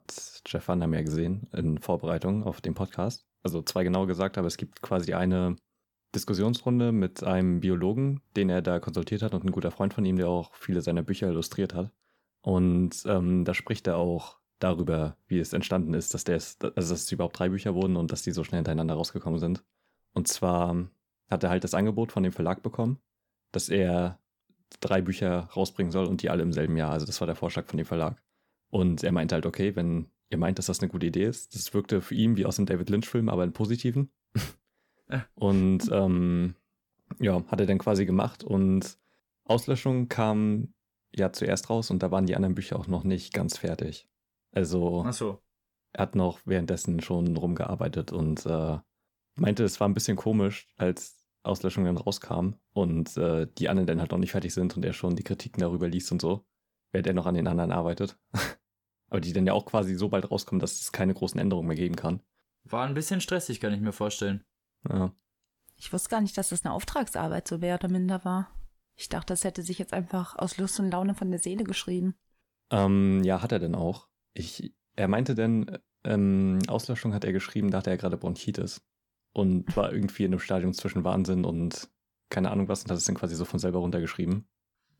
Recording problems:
none

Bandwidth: 18 kHz